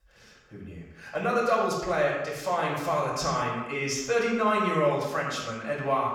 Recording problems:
echo of what is said; strong; throughout; 110 ms later, 9 dB below the speech
off-mic speech; far
room echo; noticeable; dies away in 0.7 s

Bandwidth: 18.5 kHz